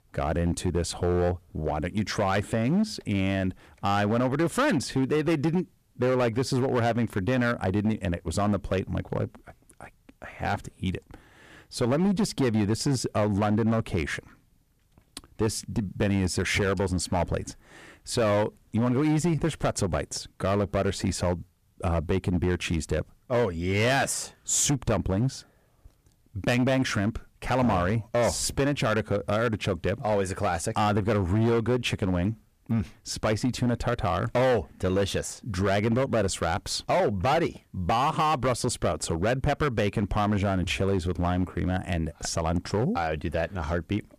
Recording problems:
distortion; slight; 9% of the sound clipped

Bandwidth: 14.5 kHz